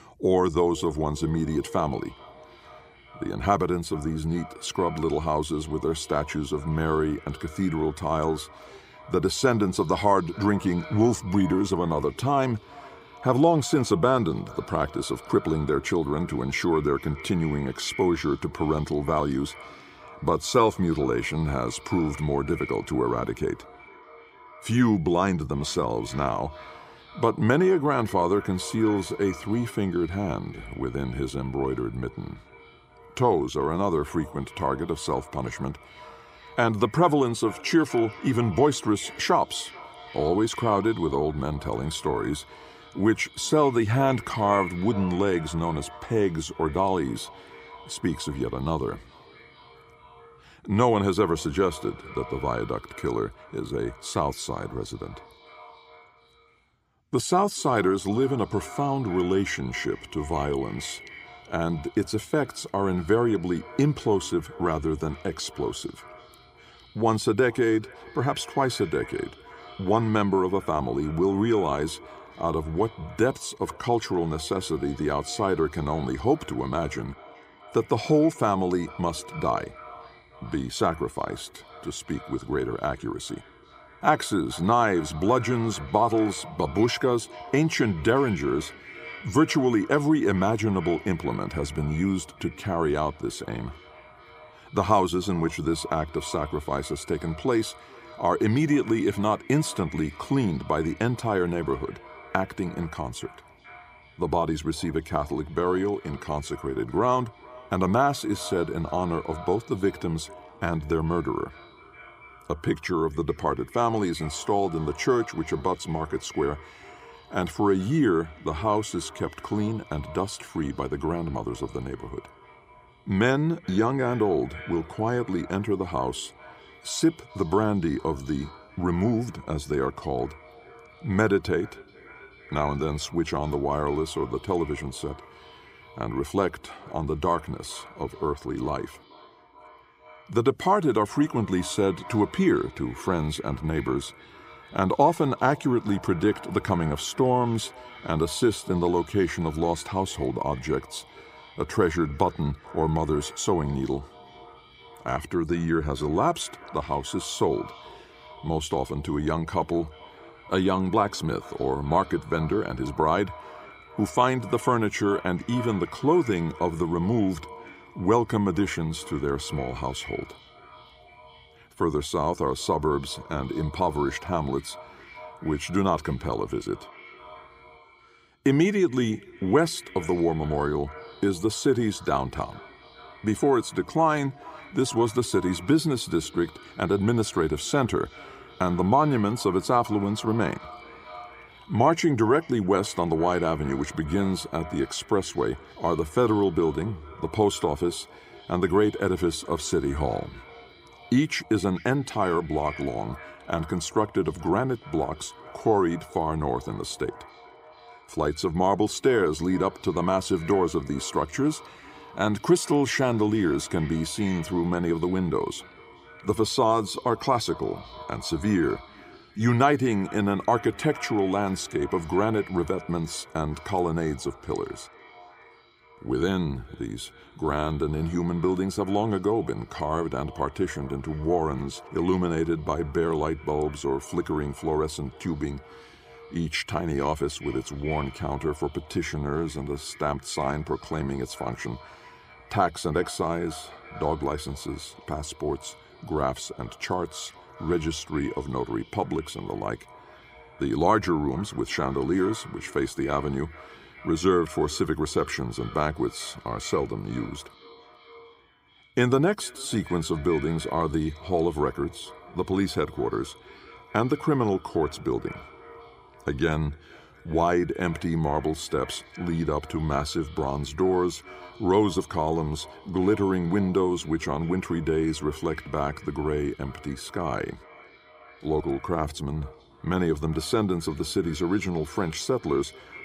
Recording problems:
echo of what is said; faint; throughout; 430 ms later, 20 dB below the speech

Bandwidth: 15.5 kHz